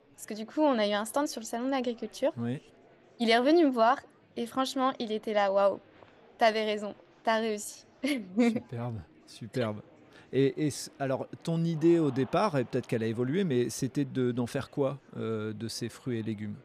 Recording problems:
murmuring crowd; faint; throughout; 30 dB below the speech

